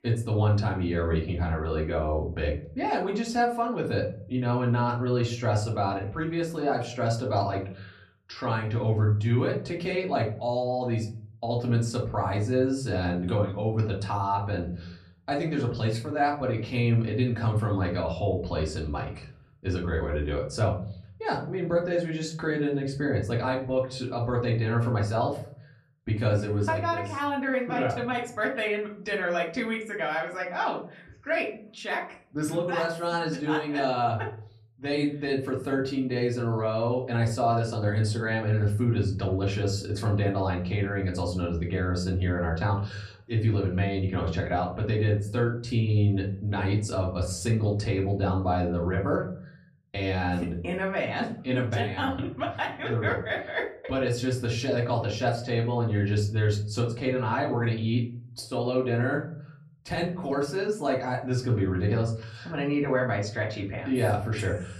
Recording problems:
off-mic speech; far
room echo; very slight; dies away in 0.4 s

